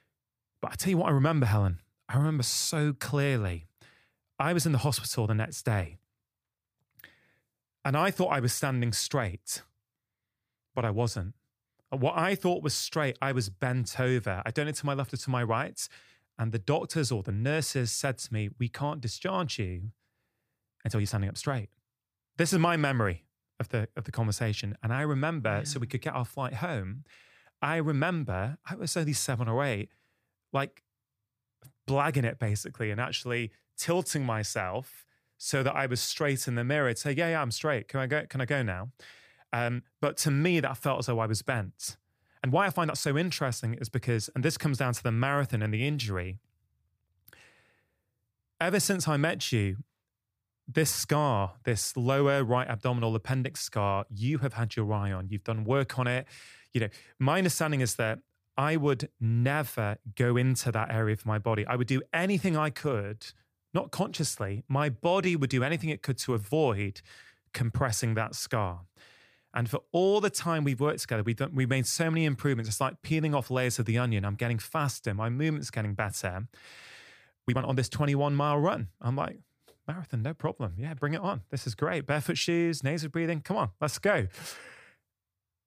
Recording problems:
uneven, jittery; strongly; from 2 s to 1:25

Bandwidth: 15 kHz